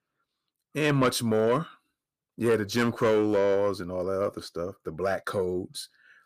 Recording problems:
distortion; slight; 10 dB below the speech

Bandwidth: 15 kHz